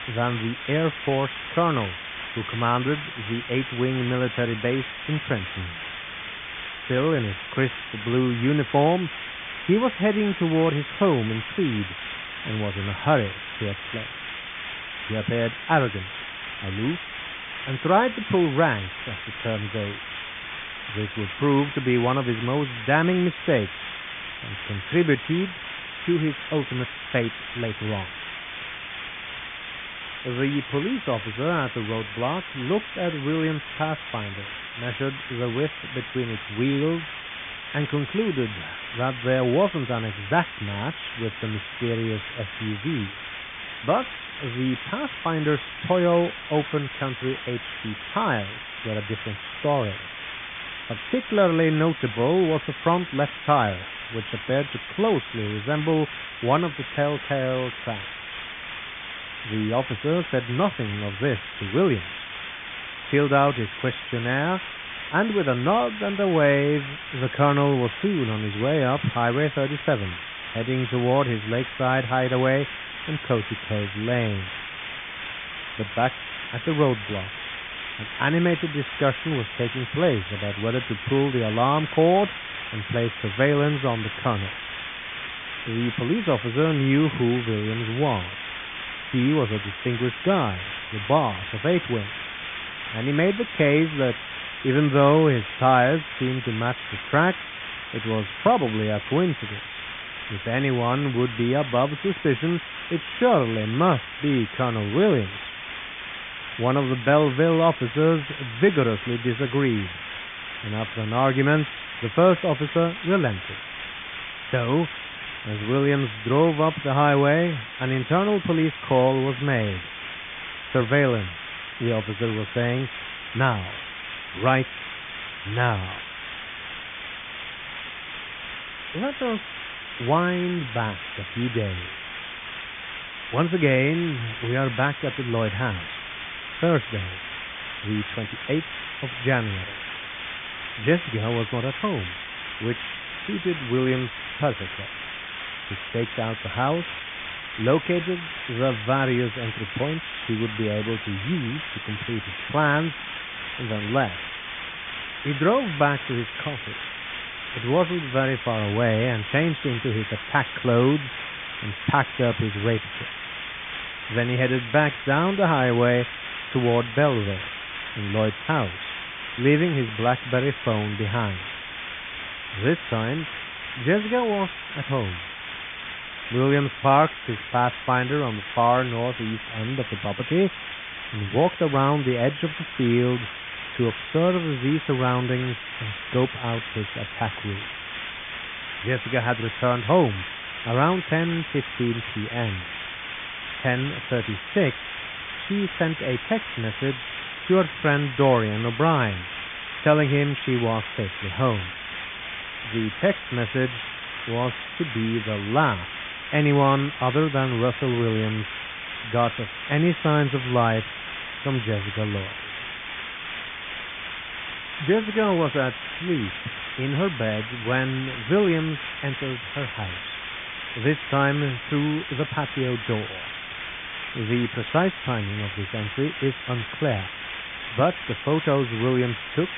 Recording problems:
high frequencies cut off; severe; nothing above 3.5 kHz
hiss; loud; throughout; 8 dB below the speech

